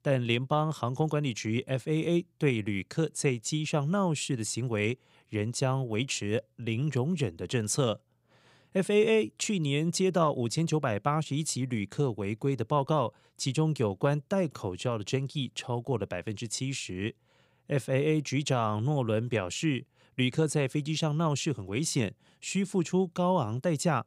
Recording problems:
none

